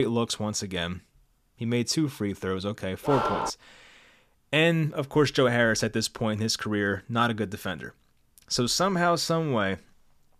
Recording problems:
abrupt cut into speech; at the start
dog barking; noticeable; at 3 s; peak 1 dB below the speech

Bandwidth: 14.5 kHz